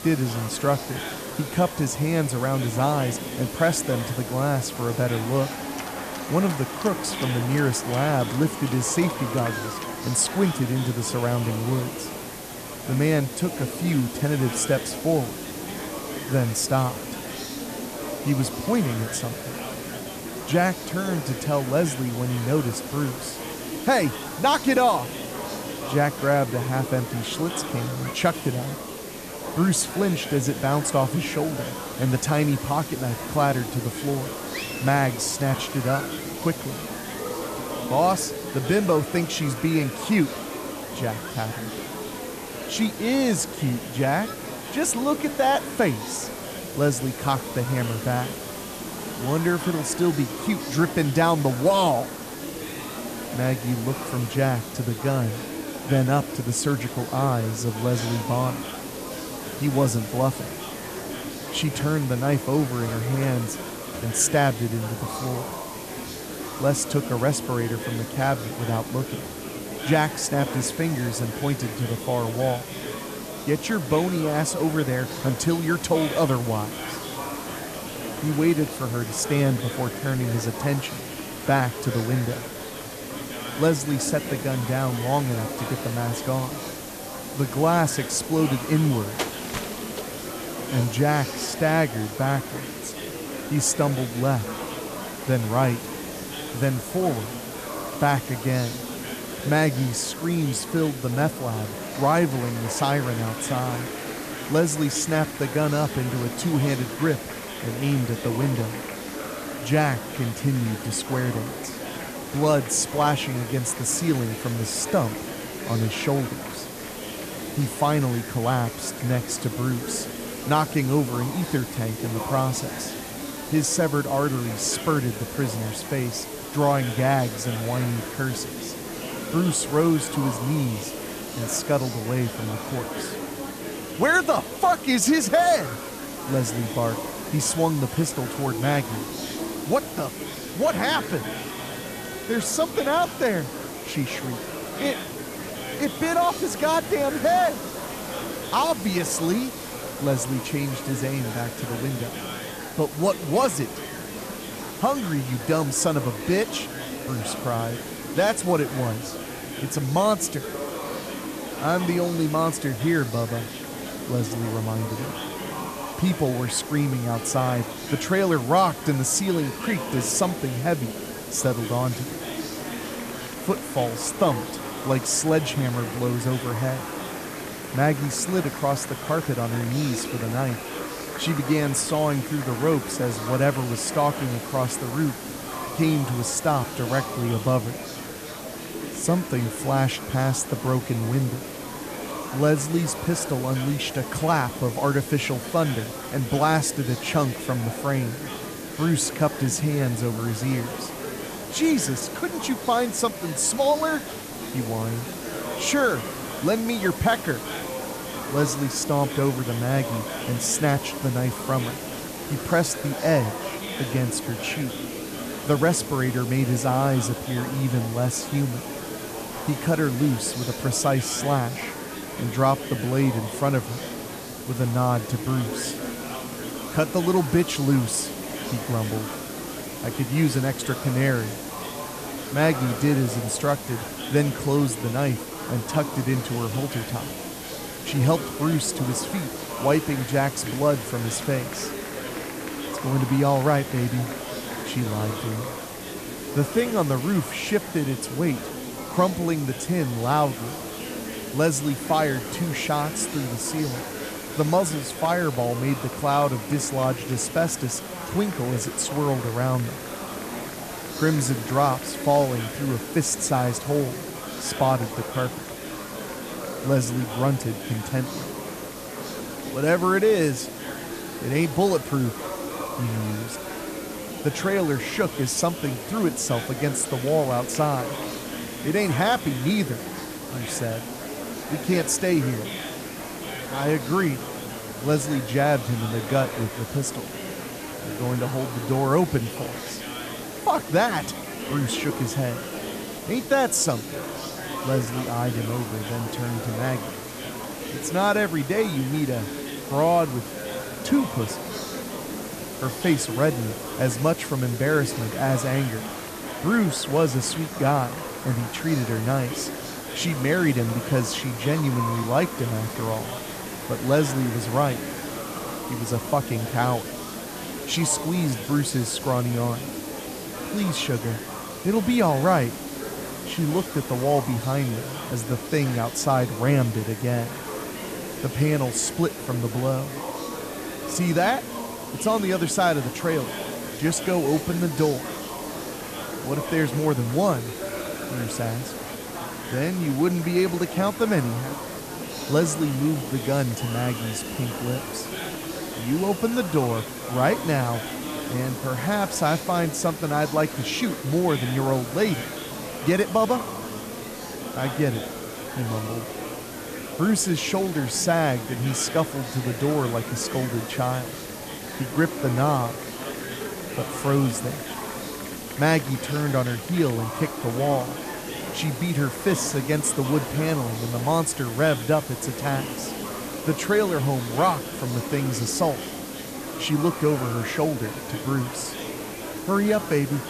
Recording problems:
murmuring crowd; loud; throughout; 9 dB below the speech
hiss; noticeable; throughout; 15 dB below the speech

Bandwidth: 14.5 kHz